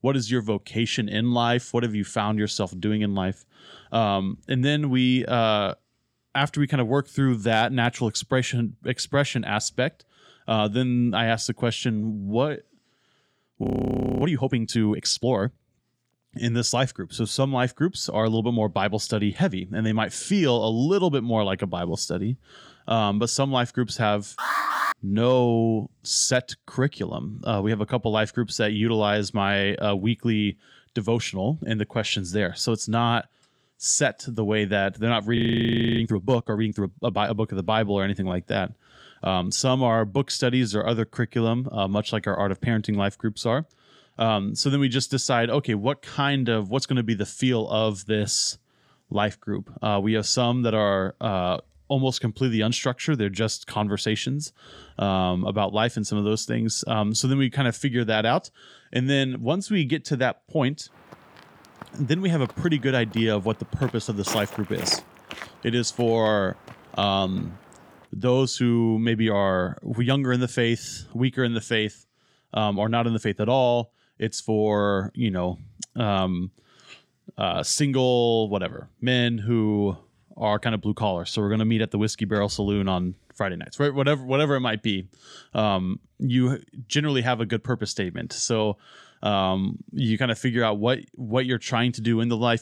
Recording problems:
audio freezing; at 14 s for 0.5 s and at 35 s for 0.5 s
alarm; loud; at 24 s; peak 1 dB above the speech
footsteps; noticeable; from 1:01 to 1:07; peak 9 dB below the speech

